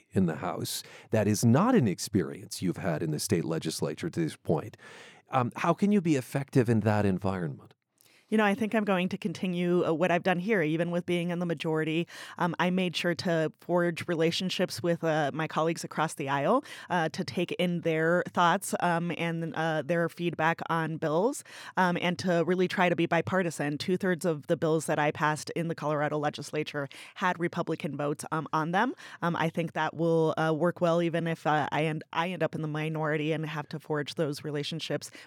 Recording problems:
none

